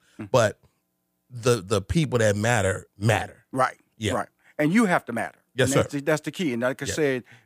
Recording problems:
none

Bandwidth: 15 kHz